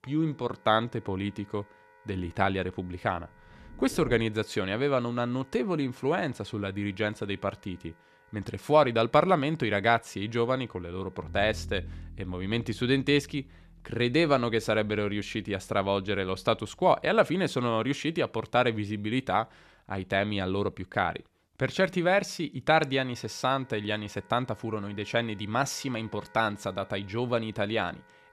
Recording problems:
background music; faint; throughout; 25 dB below the speech

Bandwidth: 14 kHz